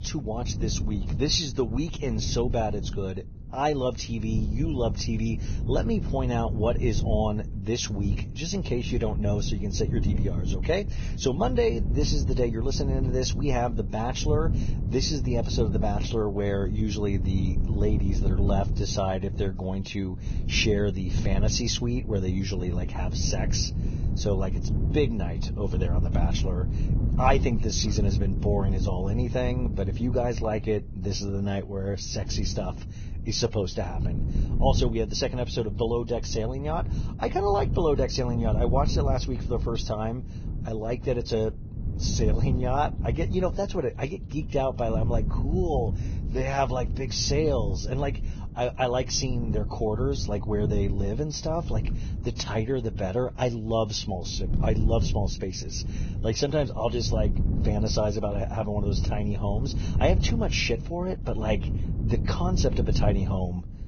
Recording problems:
garbled, watery; badly; nothing above 6.5 kHz
wind noise on the microphone; occasional gusts; 15 dB below the speech

